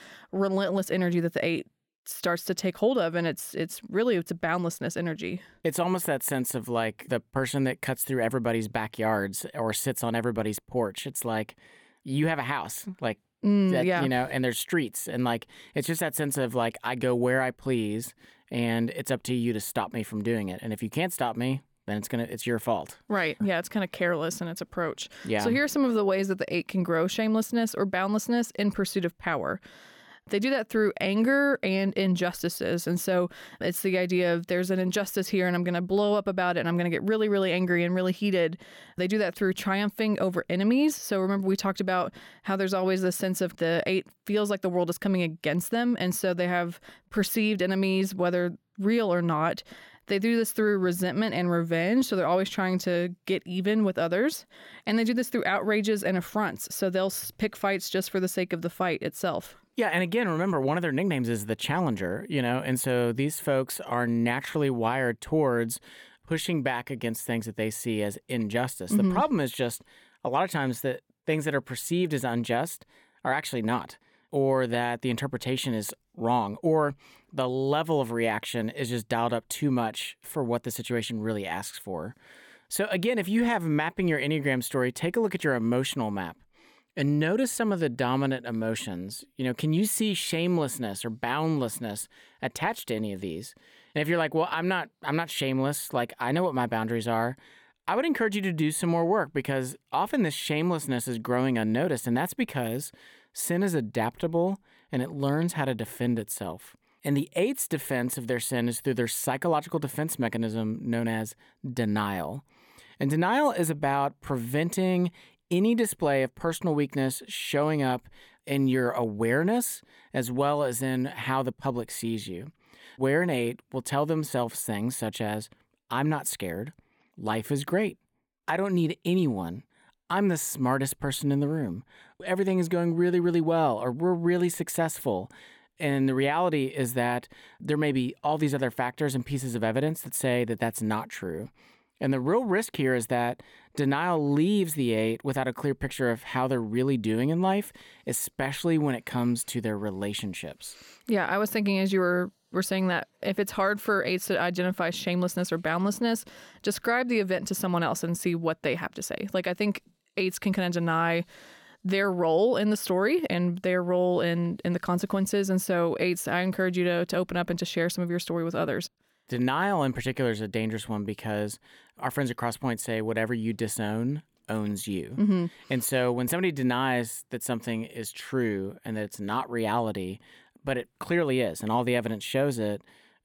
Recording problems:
none

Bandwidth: 17.5 kHz